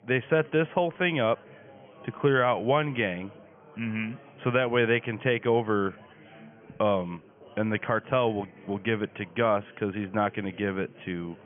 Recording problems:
high frequencies cut off; severe; nothing above 3.5 kHz
chatter from many people; faint; throughout; 25 dB below the speech

